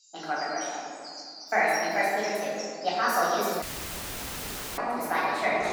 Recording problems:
room echo; strong; dies away in 2.3 s
off-mic speech; far
wrong speed and pitch; too fast and too high; 1.6 times normal speed
echo of what is said; very faint; from 5 s on; 290 ms later, 25 dB below the speech
animal sounds; noticeable; throughout; 15 dB below the speech
audio cutting out; filled with static; at 3.5 s for 1 s

